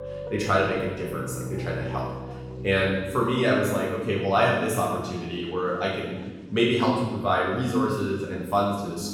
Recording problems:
off-mic speech; far
room echo; noticeable; dies away in 1.2 s
background music; noticeable; until 3.5 s; 10 dB below the speech
chatter from many people; faint; throughout; 25 dB below the speech

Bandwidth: 17 kHz